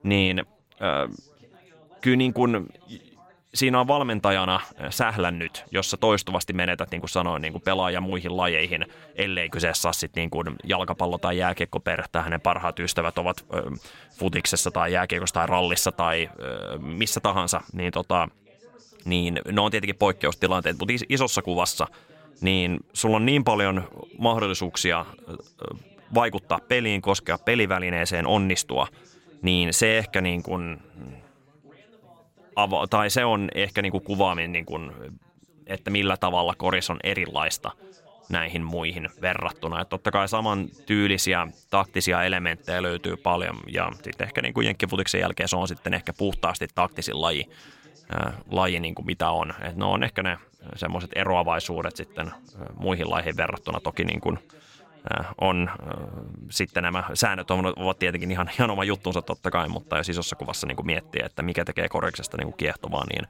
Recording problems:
background chatter; faint; throughout; 2 voices, 30 dB below the speech

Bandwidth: 16 kHz